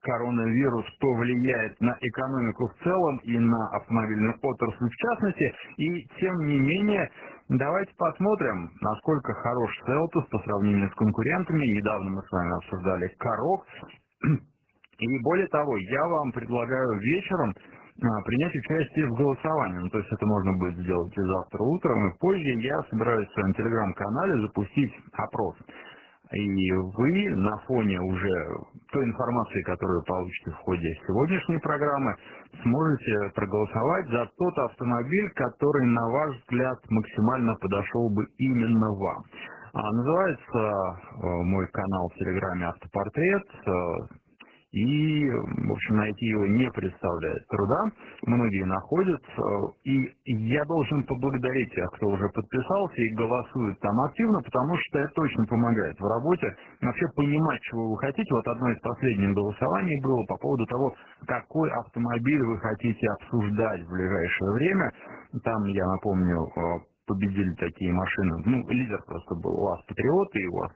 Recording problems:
garbled, watery; badly; nothing above 3 kHz

